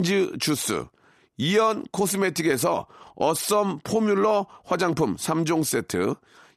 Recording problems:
abrupt cut into speech; at the start

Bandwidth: 13.5 kHz